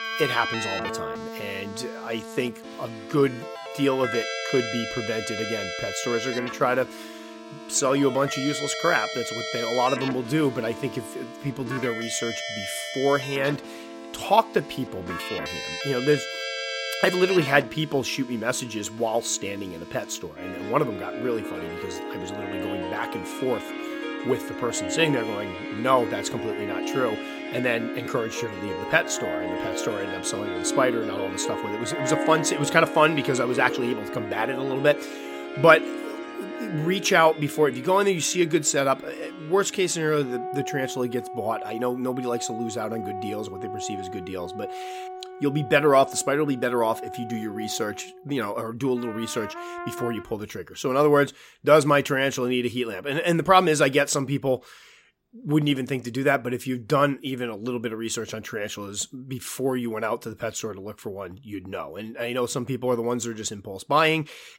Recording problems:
background music; loud; until 50 s; 8 dB below the speech

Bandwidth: 16 kHz